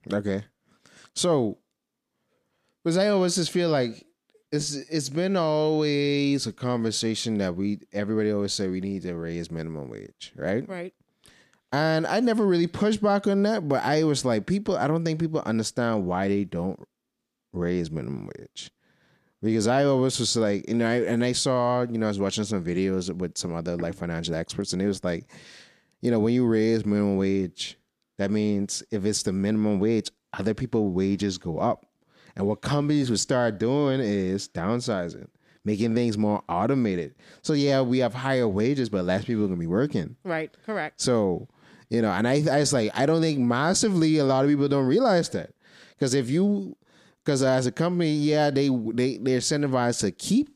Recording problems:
none

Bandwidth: 15 kHz